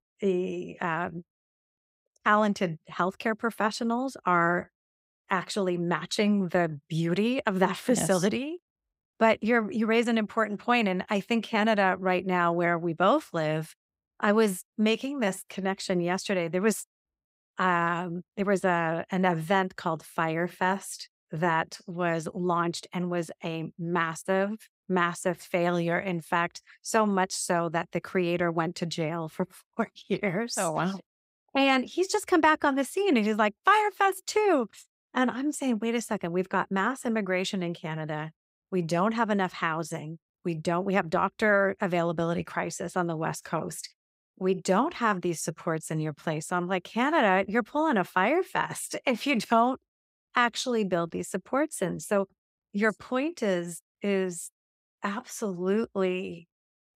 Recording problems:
none

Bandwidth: 15.5 kHz